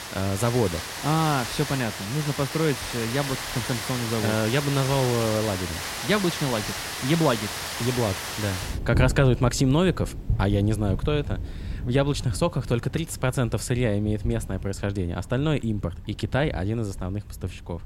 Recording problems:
rain or running water; loud; throughout; 6 dB below the speech

